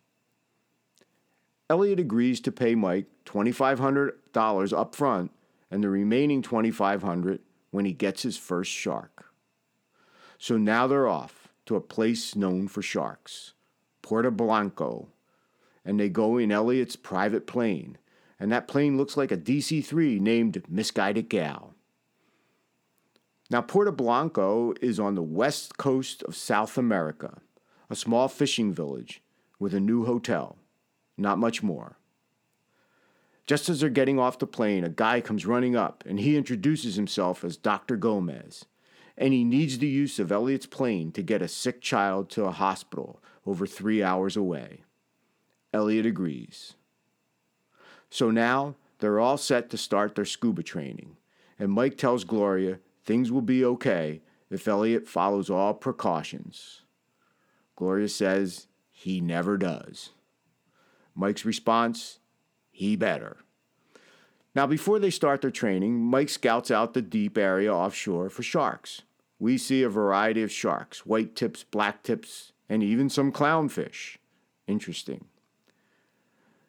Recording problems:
none

